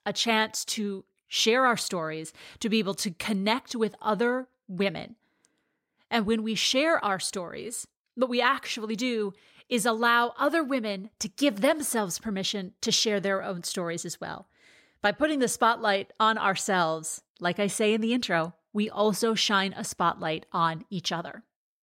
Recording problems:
none

